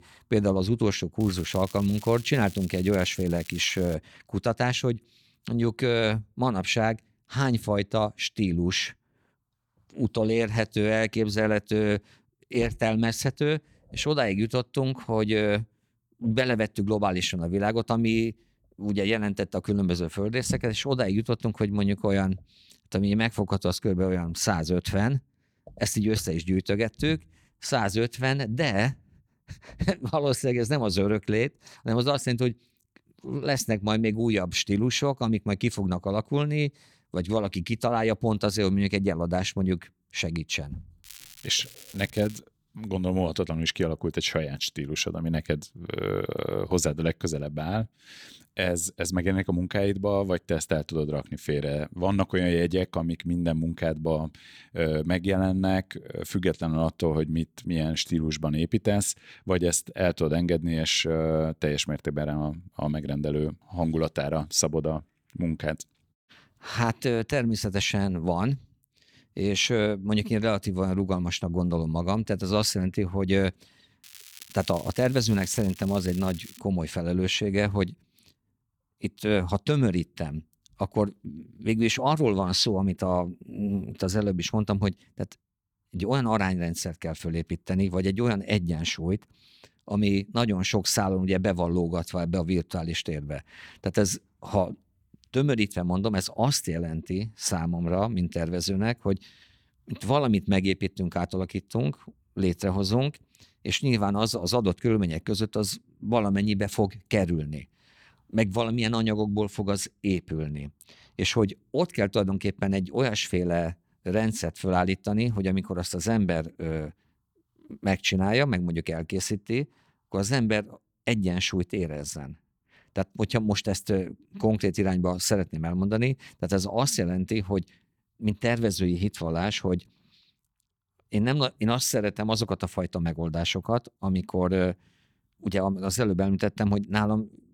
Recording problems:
crackling; noticeable; from 1 to 4 s, from 41 to 42 s and from 1:14 to 1:17; 20 dB below the speech

